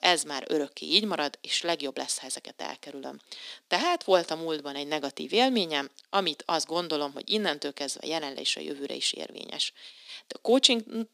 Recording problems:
thin; somewhat; fading below 250 Hz

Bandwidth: 15 kHz